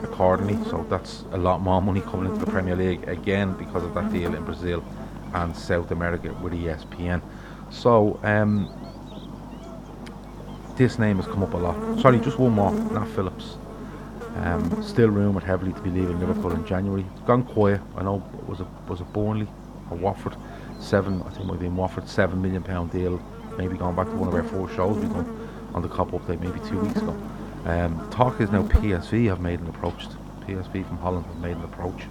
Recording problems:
muffled; slightly; fading above 3 kHz
electrical hum; noticeable; throughout; 50 Hz, 10 dB below the speech
voice in the background; faint; throughout; 30 dB below the speech

